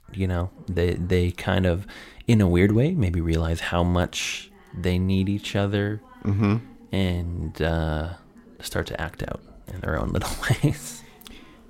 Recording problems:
background chatter; faint; throughout; 2 voices, 25 dB below the speech

